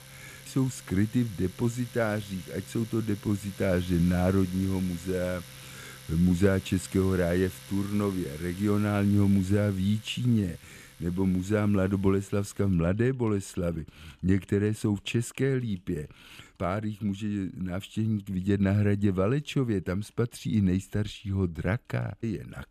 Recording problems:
household noises; noticeable; throughout; 20 dB below the speech

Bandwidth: 14.5 kHz